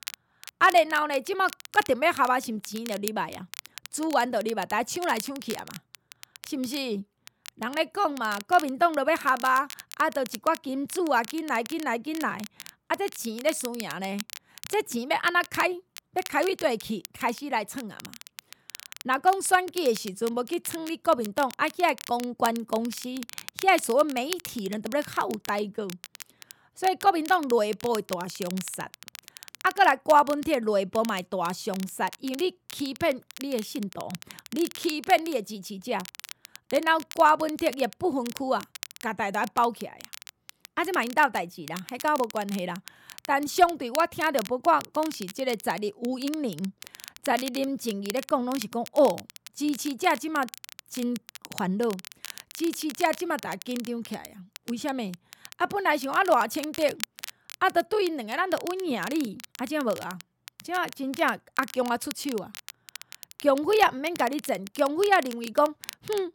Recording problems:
crackle, like an old record; noticeable; 15 dB below the speech

